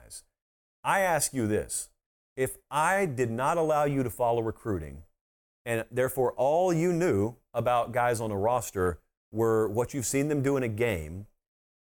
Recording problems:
none

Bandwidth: 17 kHz